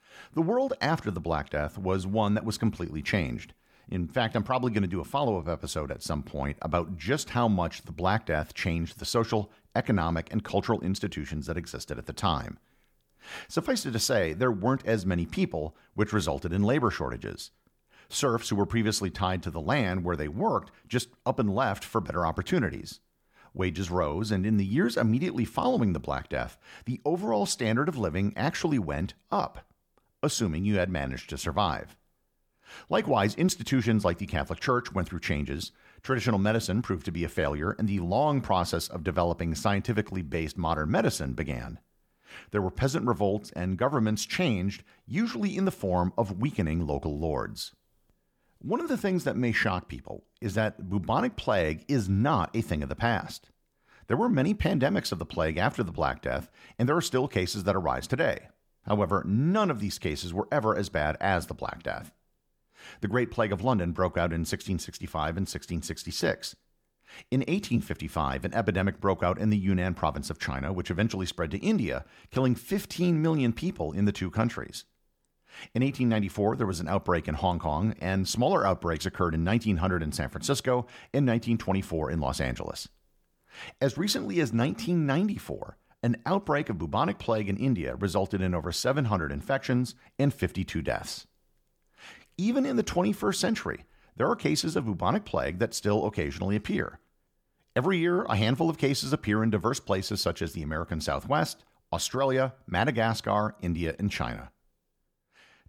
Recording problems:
none

